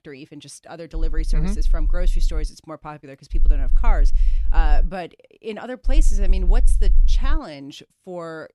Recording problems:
low rumble; noticeable; from 1 to 2.5 s, from 3.5 to 5 s and from 6 to 7.5 s; 15 dB below the speech

